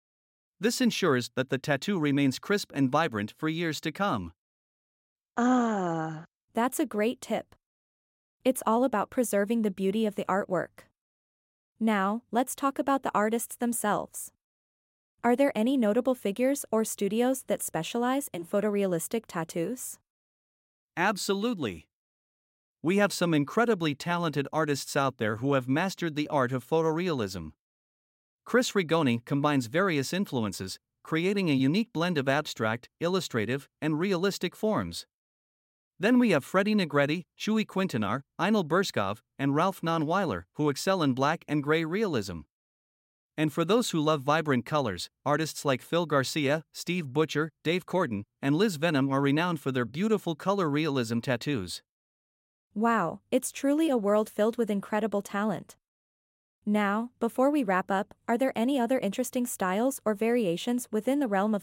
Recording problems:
none

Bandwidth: 16 kHz